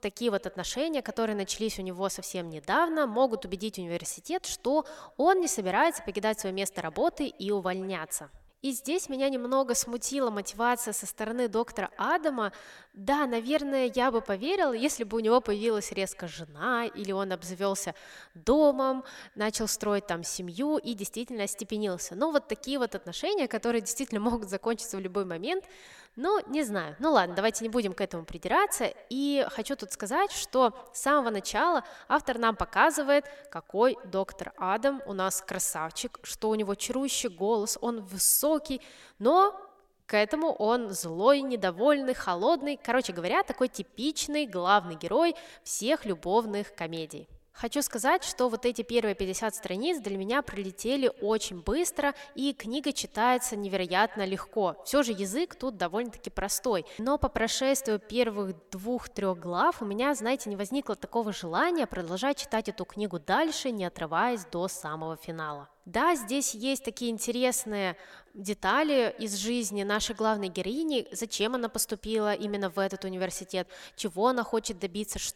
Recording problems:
echo of what is said; faint; throughout; 140 ms later, 25 dB below the speech

